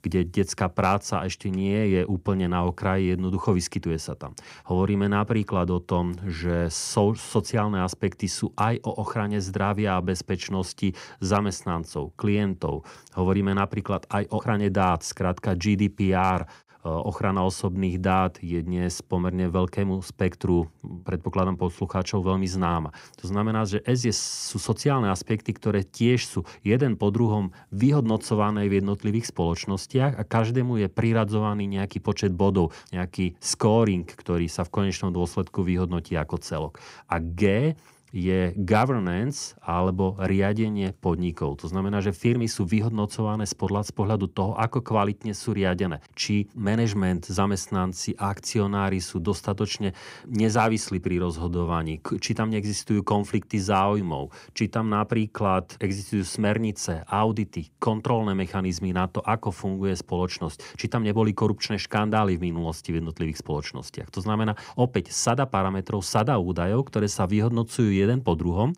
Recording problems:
none

